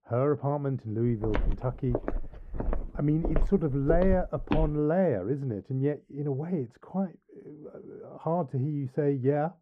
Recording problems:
muffled; very; fading above 1.5 kHz
footsteps; noticeable; from 1 to 4.5 s; peak 2 dB below the speech

